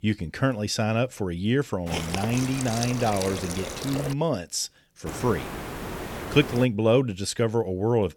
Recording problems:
hiss; loud; from 2 to 4 s and from 5 to 6.5 s; 7 dB below the speech

